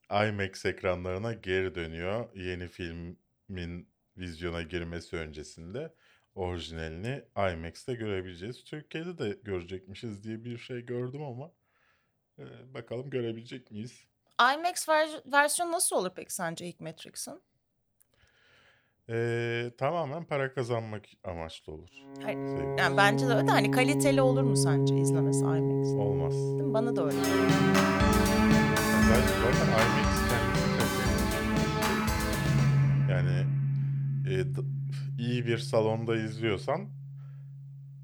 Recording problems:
background music; very loud; from 22 s on; 5 dB above the speech

